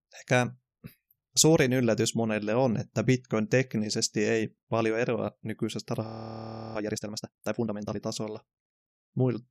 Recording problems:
audio freezing; at 6 s for 0.5 s

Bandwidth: 14.5 kHz